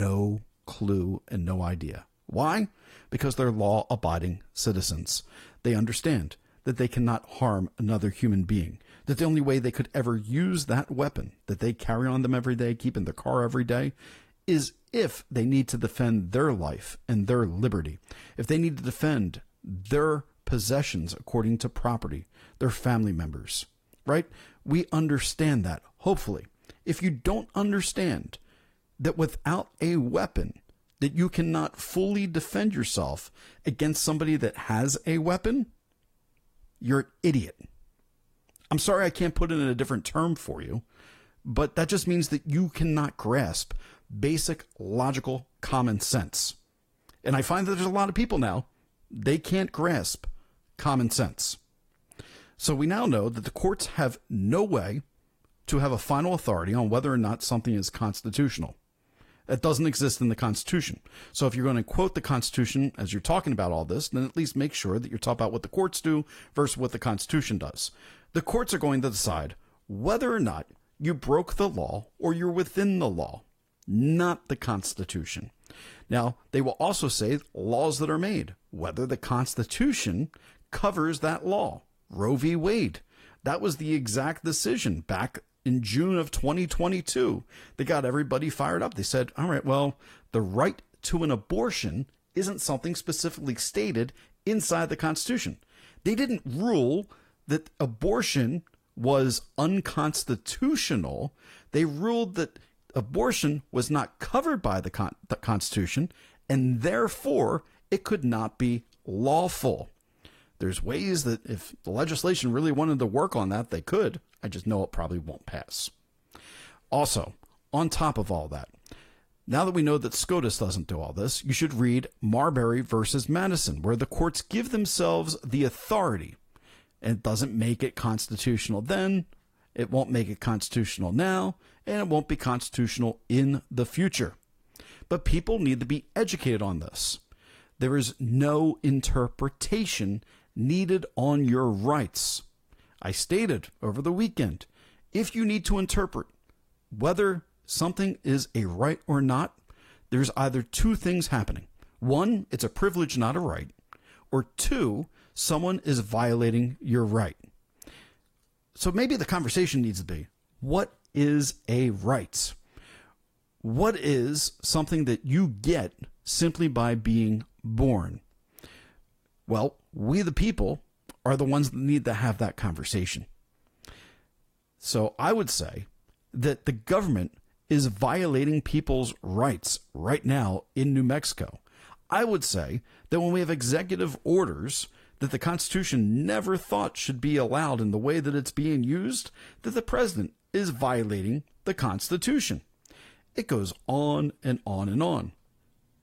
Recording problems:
garbled, watery; slightly; nothing above 14.5 kHz
abrupt cut into speech; at the start

